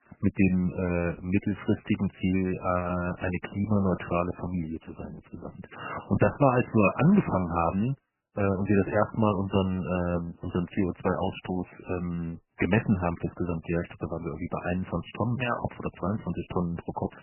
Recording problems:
garbled, watery; badly; nothing above 3 kHz

